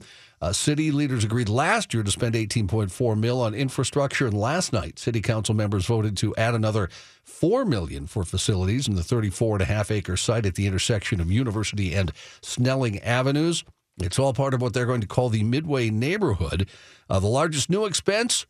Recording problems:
none

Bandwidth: 14.5 kHz